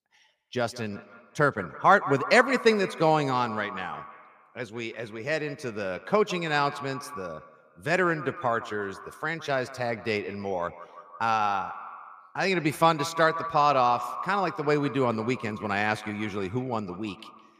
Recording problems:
echo of what is said; noticeable; throughout; 170 ms later, 10 dB below the speech

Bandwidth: 15 kHz